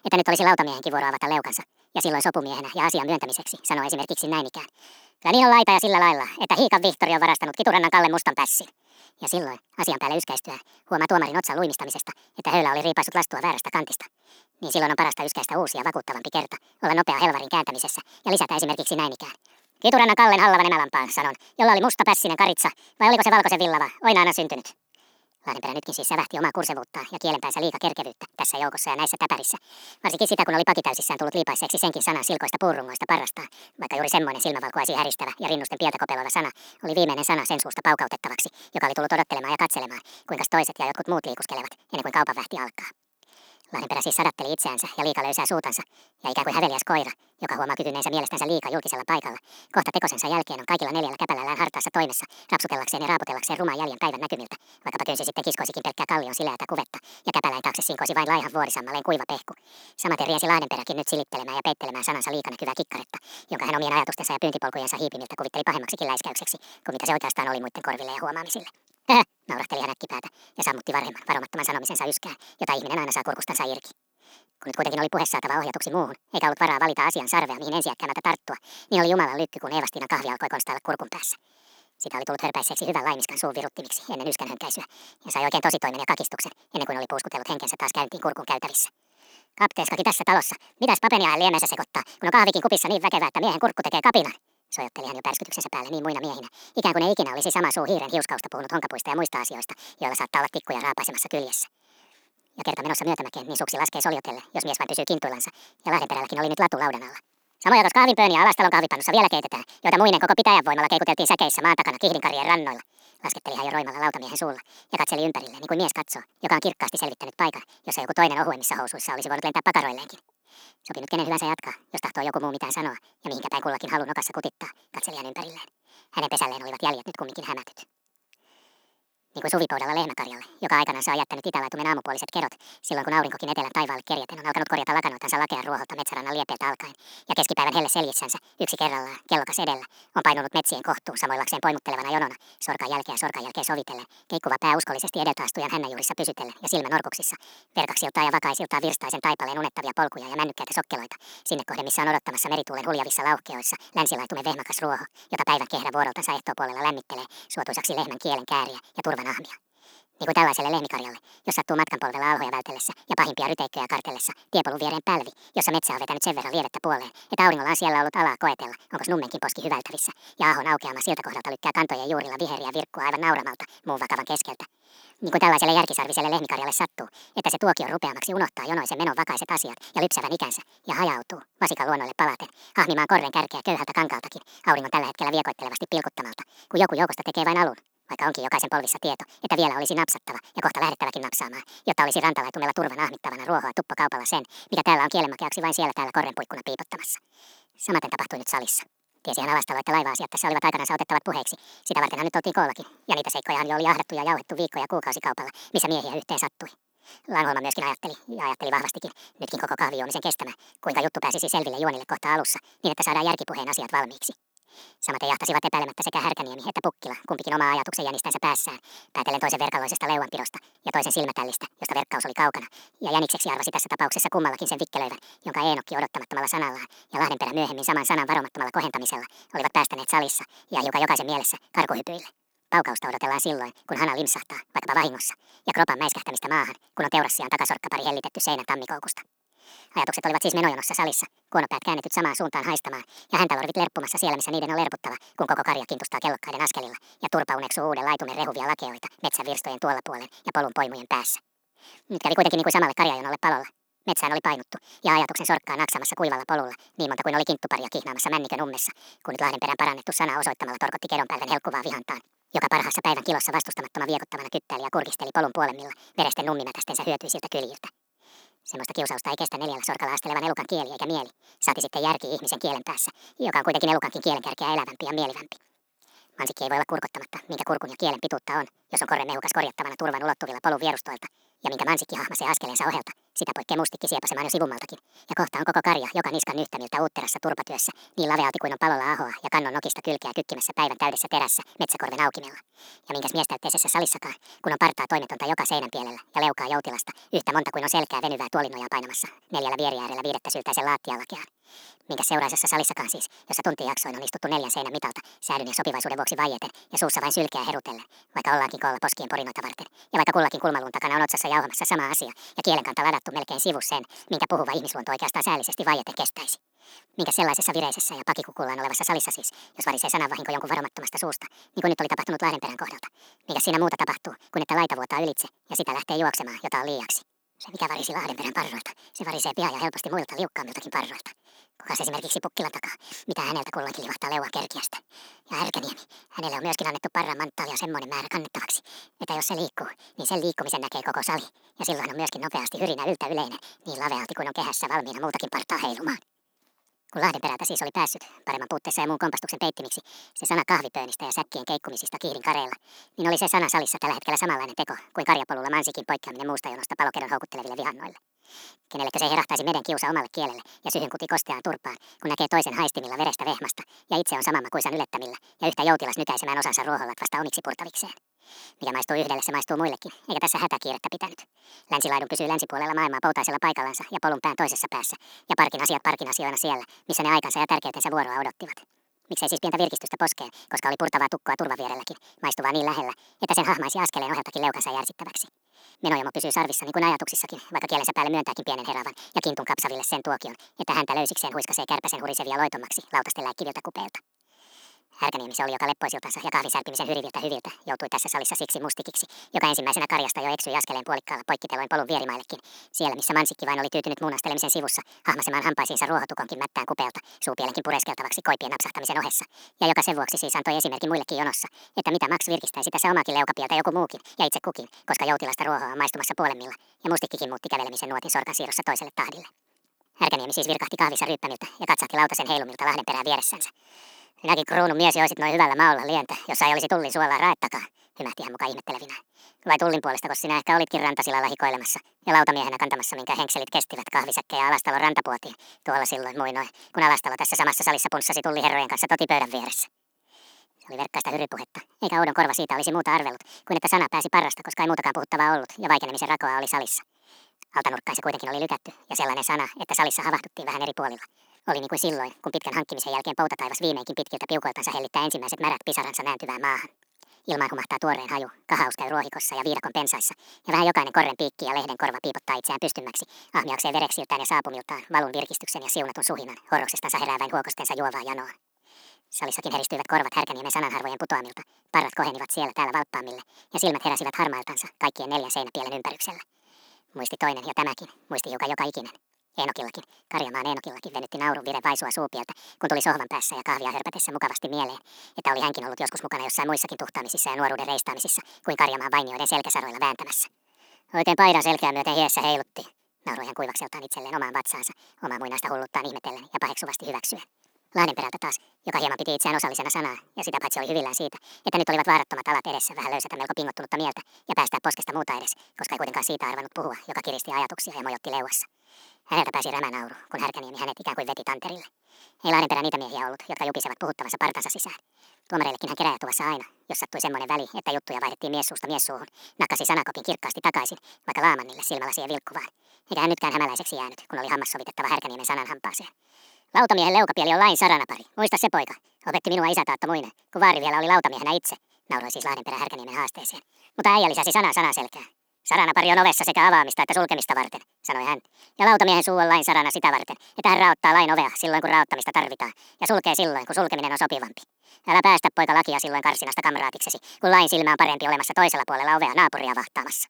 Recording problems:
wrong speed and pitch; too fast and too high; 1.7 times normal speed

